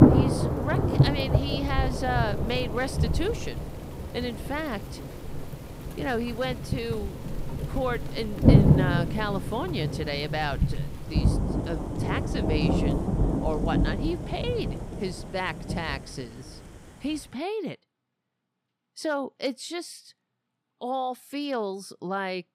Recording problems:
rain or running water; very loud; until 17 s; 5 dB above the speech

